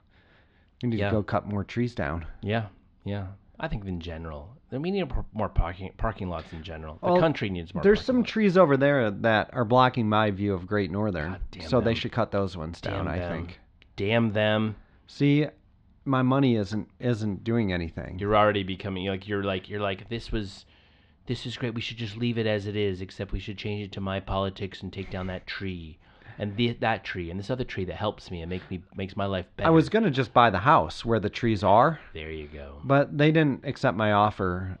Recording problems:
muffled; slightly; fading above 4 kHz

